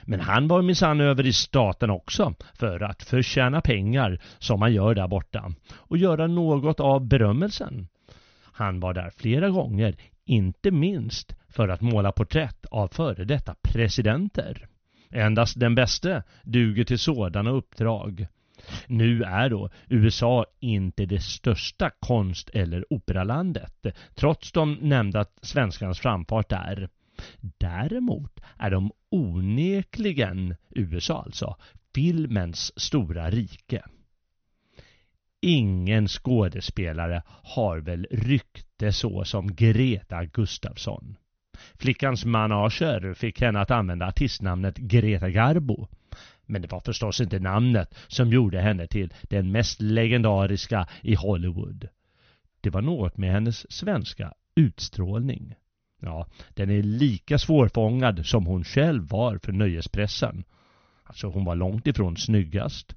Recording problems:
high frequencies cut off; noticeable; nothing above 6.5 kHz

